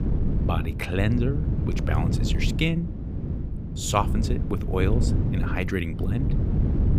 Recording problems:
wind noise on the microphone; heavy; 7 dB below the speech

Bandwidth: 15.5 kHz